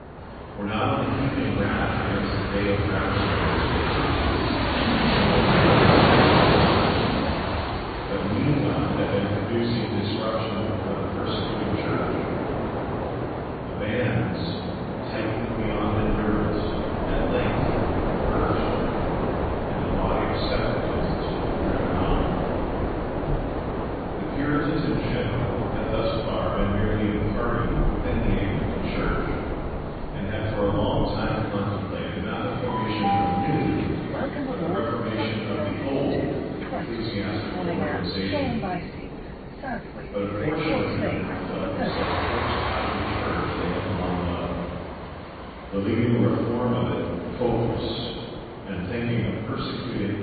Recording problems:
room echo; strong; dies away in 1.9 s
off-mic speech; far
high frequencies cut off; severe; nothing above 4.5 kHz
garbled, watery; slightly
train or aircraft noise; very loud; throughout; 1 dB above the speech

